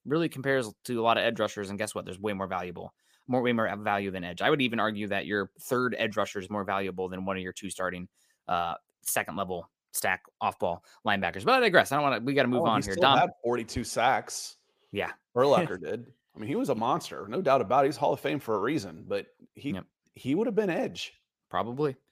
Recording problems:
none

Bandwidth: 15 kHz